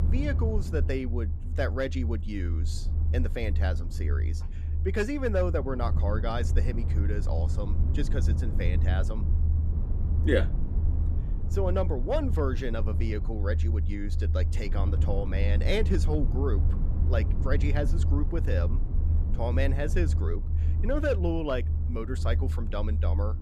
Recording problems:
low rumble; noticeable; throughout; 10 dB below the speech

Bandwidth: 14.5 kHz